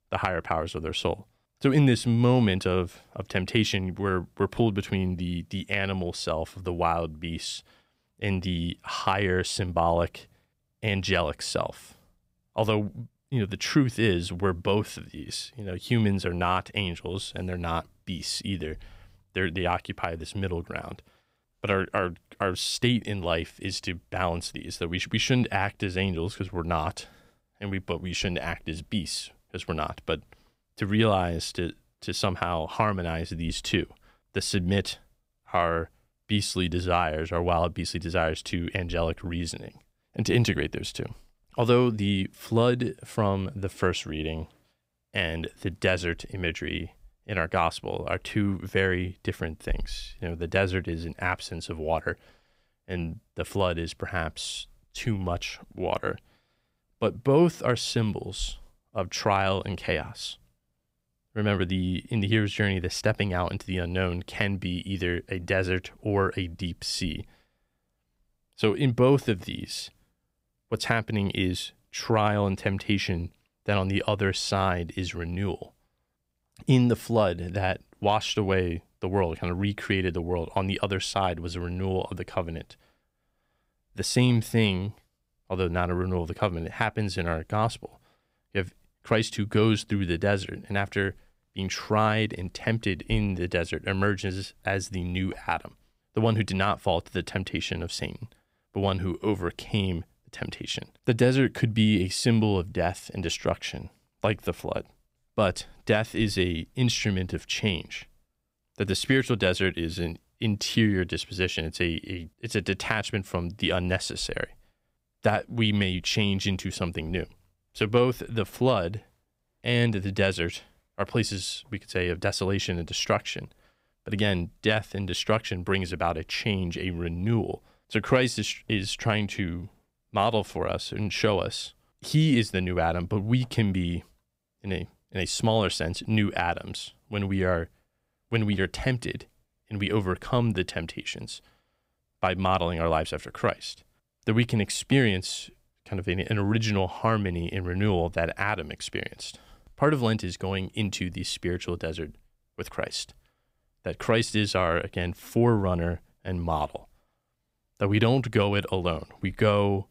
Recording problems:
none

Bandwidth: 15.5 kHz